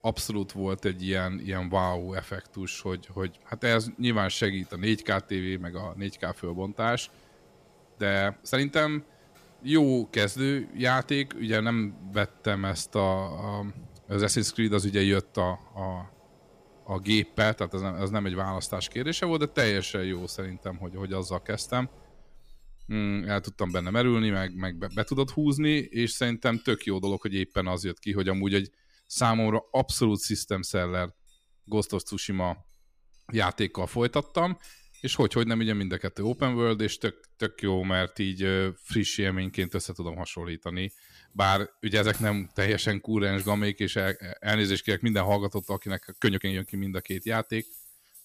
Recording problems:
household noises; faint; throughout; 25 dB below the speech
uneven, jittery; strongly; from 4 to 47 s

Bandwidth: 15 kHz